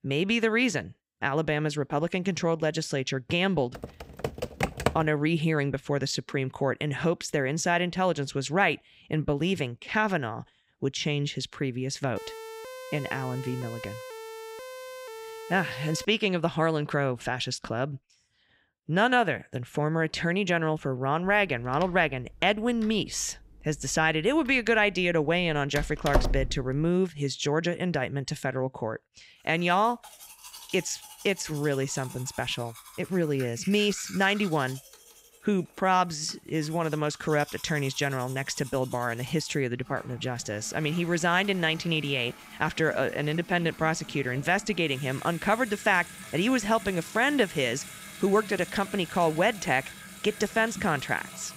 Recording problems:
household noises; noticeable; from 30 s on; 15 dB below the speech
keyboard typing; noticeable; from 4 to 5 s; peak 1 dB below the speech
siren; faint; from 12 to 16 s; peak 15 dB below the speech
door banging; noticeable; from 22 to 27 s; peak 1 dB below the speech

